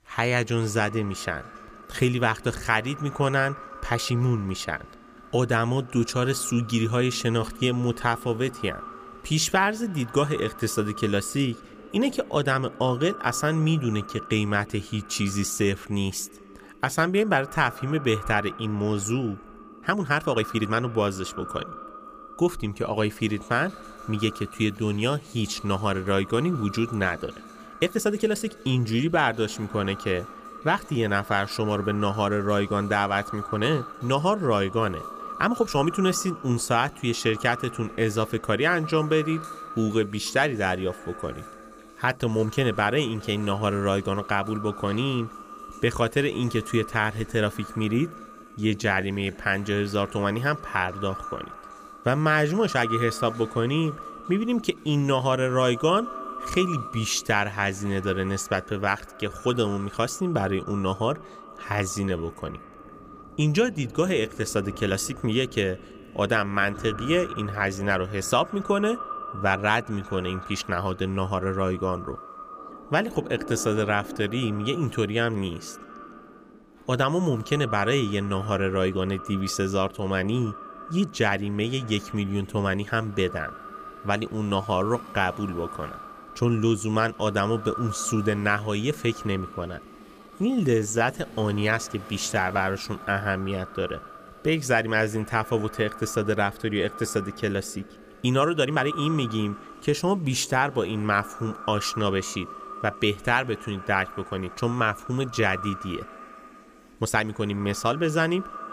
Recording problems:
echo of what is said; noticeable; throughout; 160 ms later, 15 dB below the speech
rain or running water; faint; throughout; 25 dB below the speech
uneven, jittery; strongly; from 1.5 s to 1:47

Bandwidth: 15 kHz